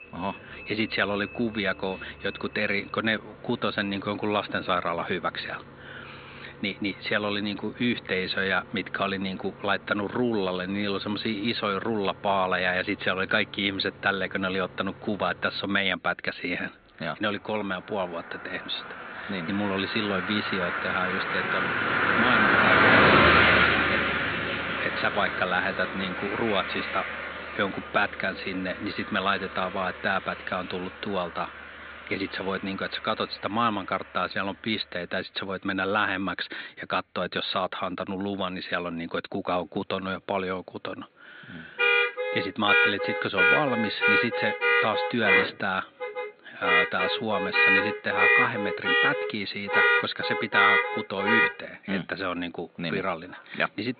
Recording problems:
high frequencies cut off; severe; nothing above 4 kHz
thin; somewhat; fading below 250 Hz
traffic noise; very loud; throughout; 5 dB above the speech

